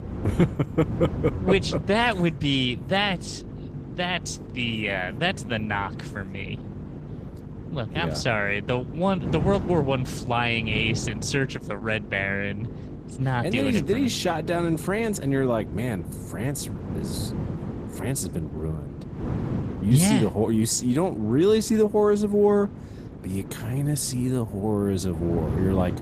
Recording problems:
garbled, watery; slightly; nothing above 14.5 kHz
wind noise on the microphone; occasional gusts; 15 dB below the speech
electrical hum; faint; throughout; 50 Hz, 25 dB below the speech

